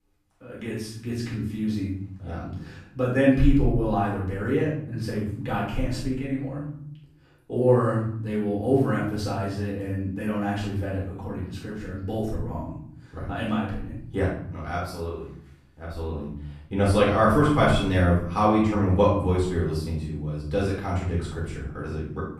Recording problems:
off-mic speech; far
room echo; noticeable; dies away in 0.8 s

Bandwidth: 14.5 kHz